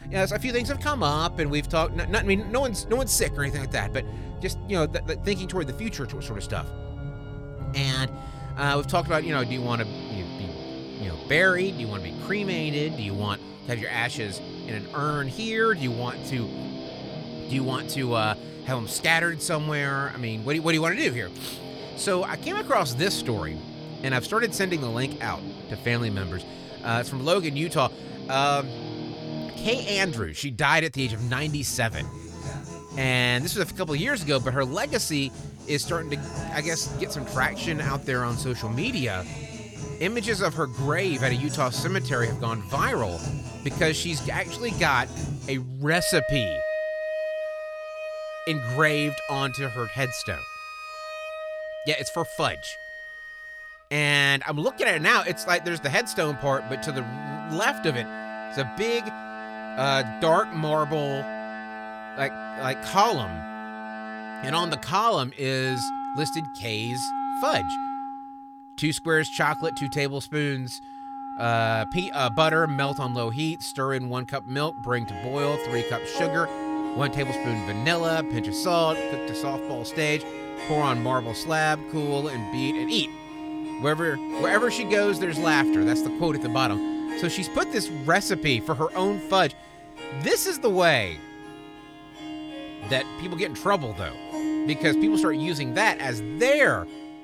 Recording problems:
background music; loud; throughout; 8 dB below the speech

